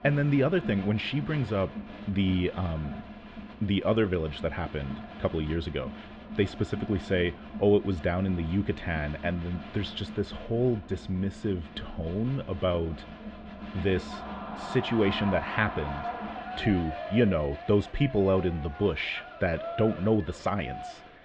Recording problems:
muffled; very; fading above 3.5 kHz
crowd noise; noticeable; throughout; 10 dB below the speech

